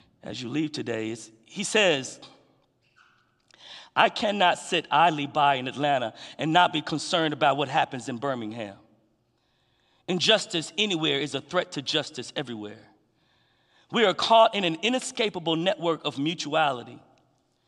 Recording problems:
none

